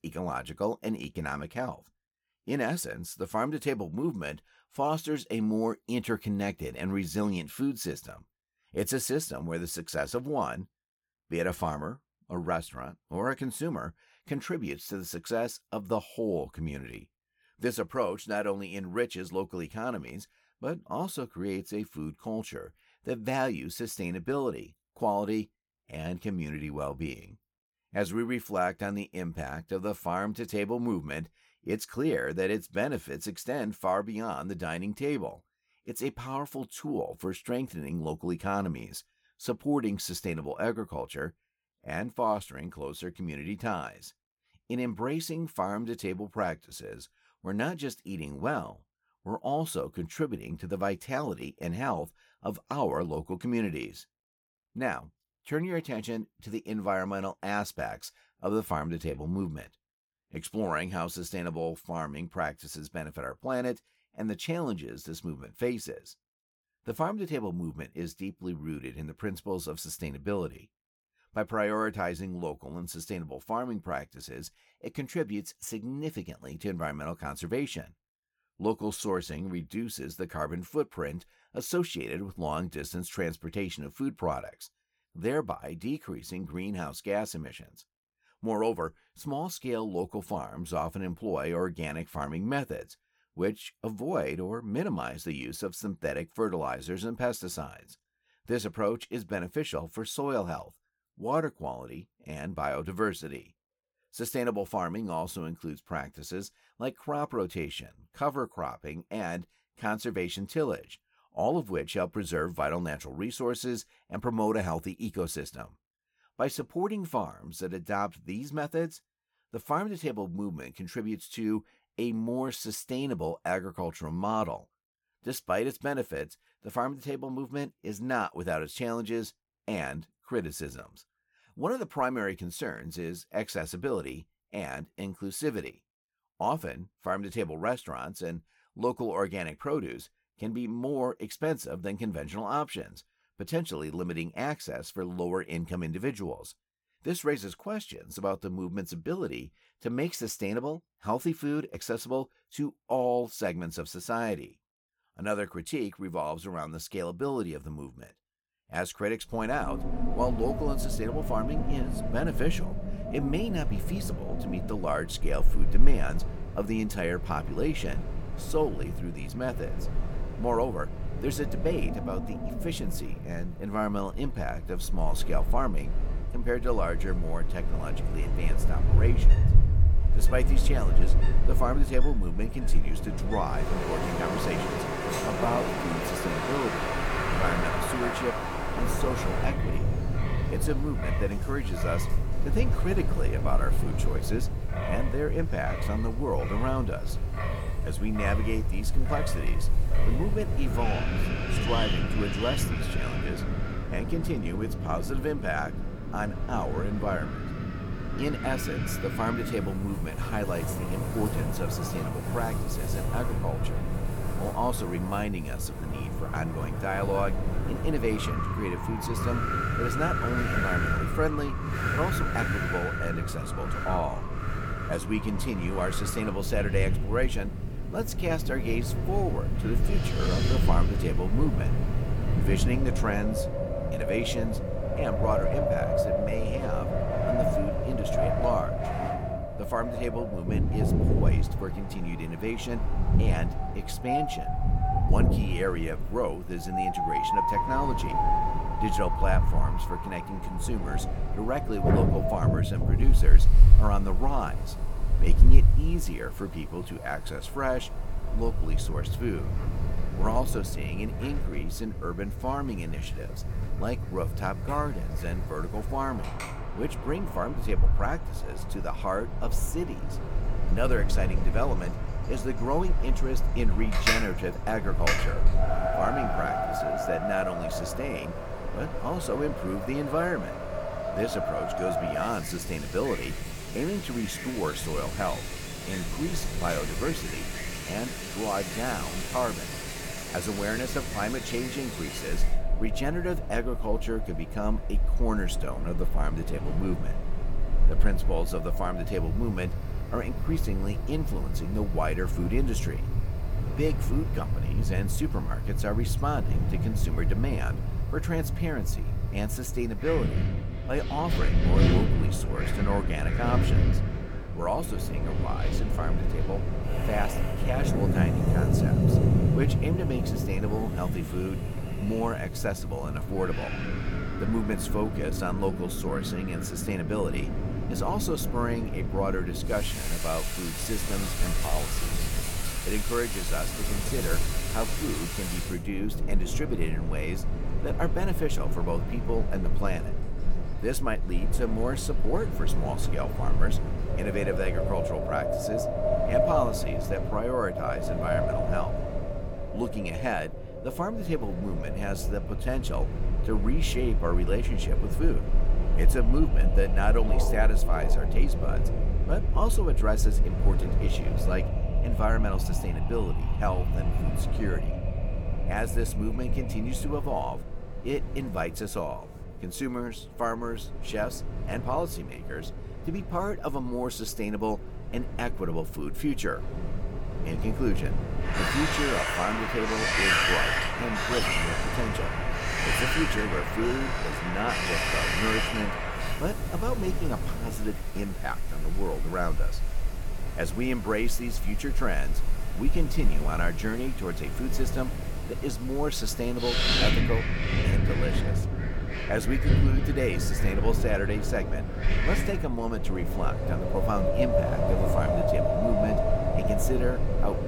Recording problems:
wind in the background; very loud; from 2:40 on; 3 dB above the speech

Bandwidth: 17.5 kHz